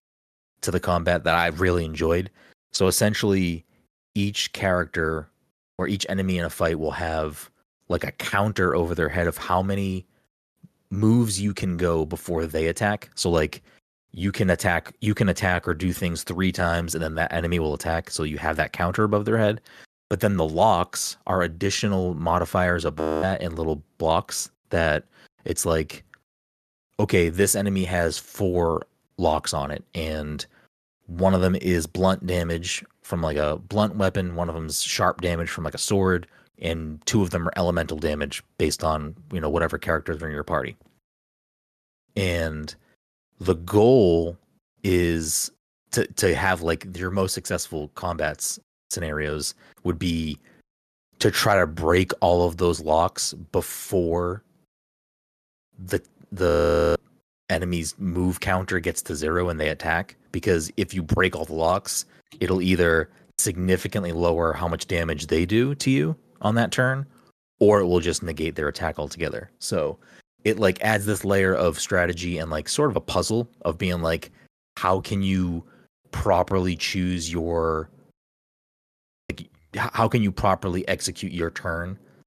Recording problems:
audio freezing; at 23 s, at 56 s and at 1:19

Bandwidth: 13.5 kHz